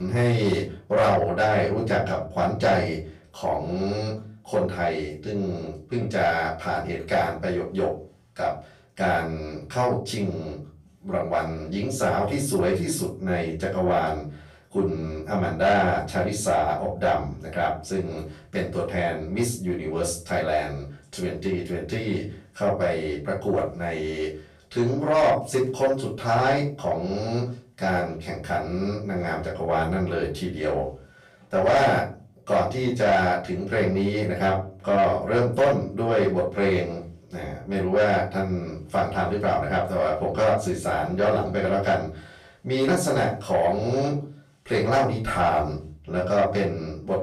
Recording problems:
off-mic speech; far
room echo; slight; dies away in 0.4 s
distortion; slight; 10 dB below the speech
abrupt cut into speech; at the start

